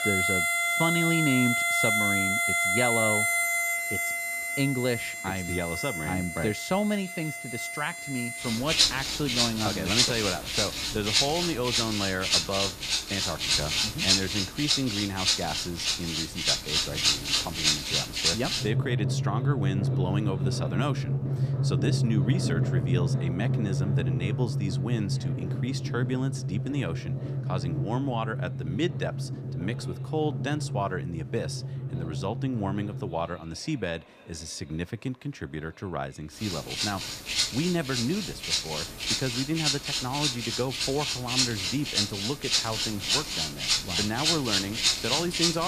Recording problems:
background music; very loud; throughout; 5 dB above the speech
murmuring crowd; faint; throughout; 25 dB below the speech
abrupt cut into speech; at the end

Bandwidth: 14.5 kHz